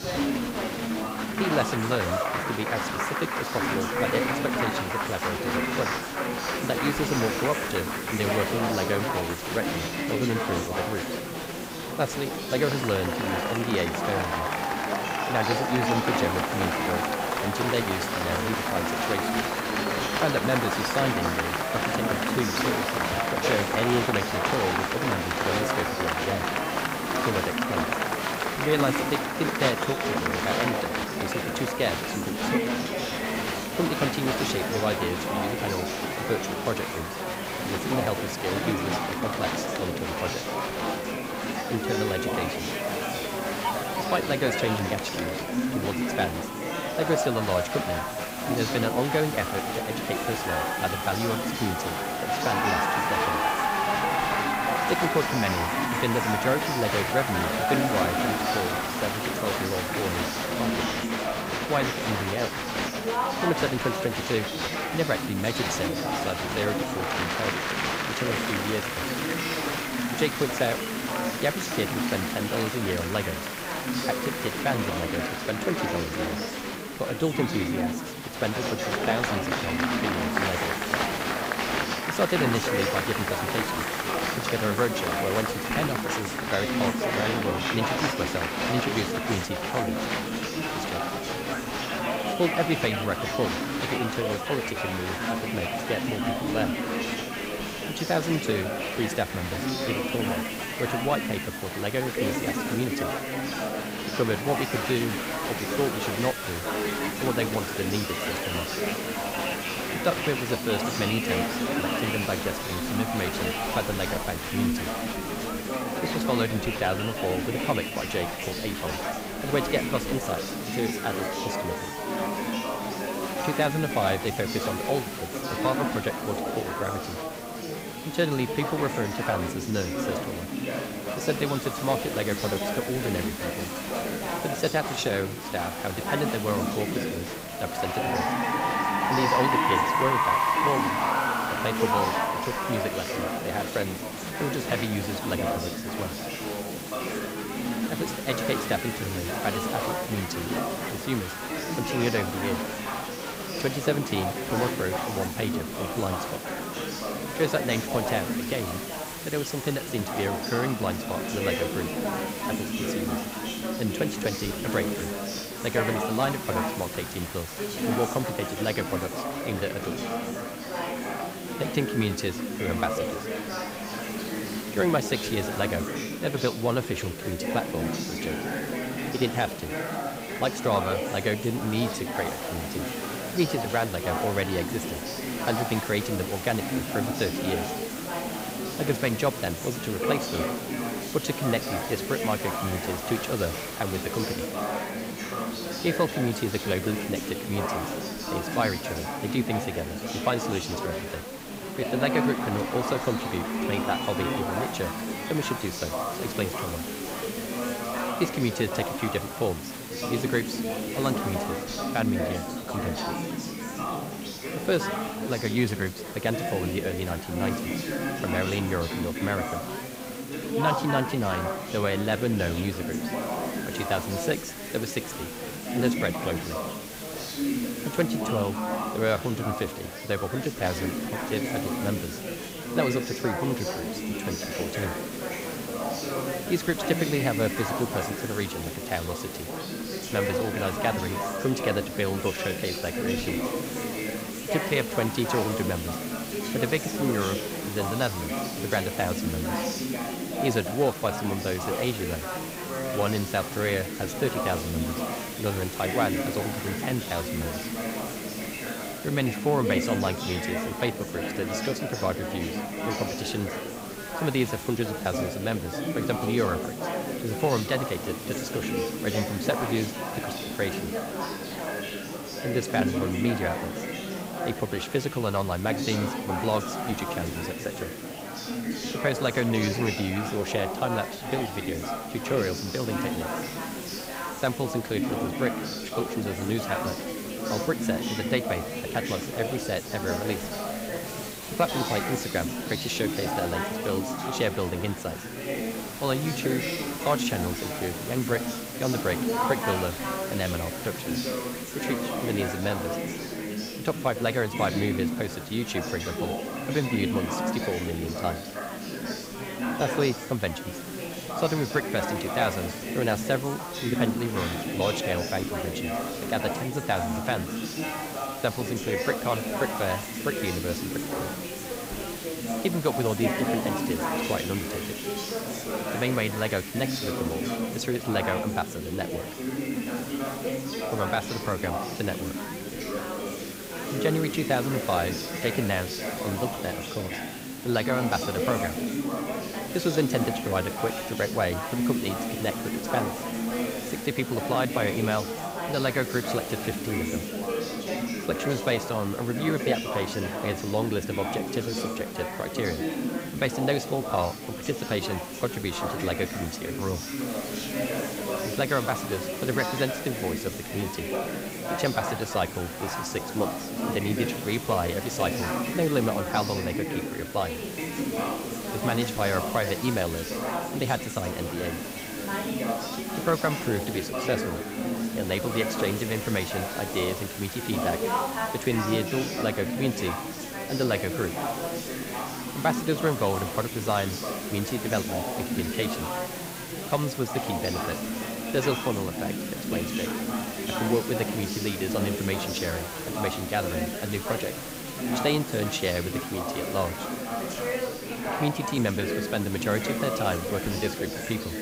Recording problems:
chatter from many people; loud; throughout; as loud as the speech
hiss; loud; throughout; 9 dB below the speech

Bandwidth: 15.5 kHz